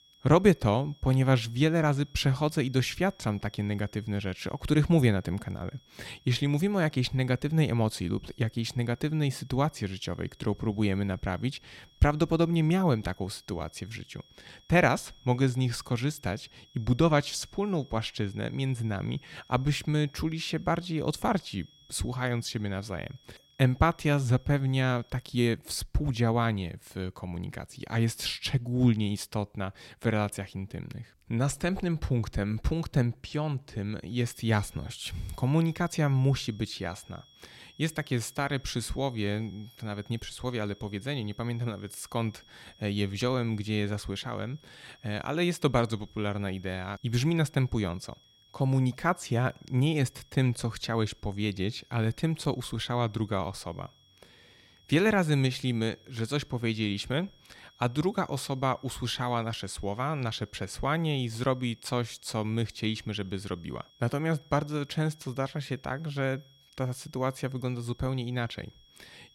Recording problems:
high-pitched whine; faint; until 25 s and from 34 s on; 3.5 kHz, 30 dB below the speech

